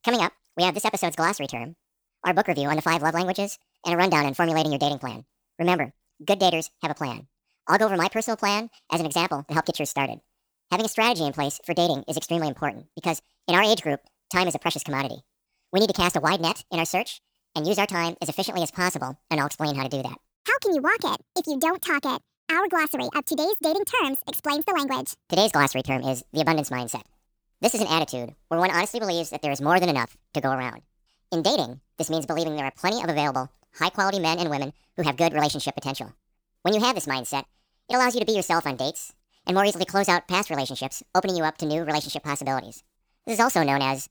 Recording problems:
wrong speed and pitch; too fast and too high; 1.6 times normal speed

